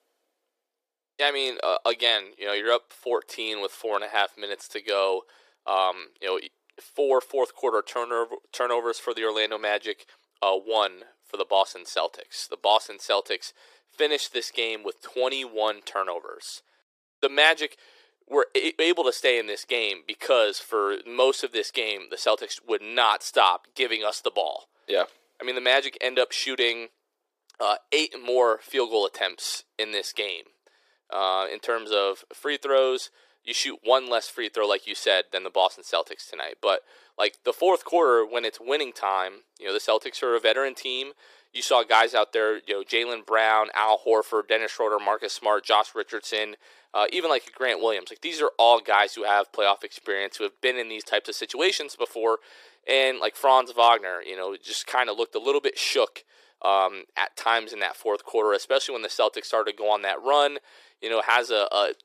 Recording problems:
thin; very; fading below 400 Hz

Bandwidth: 15 kHz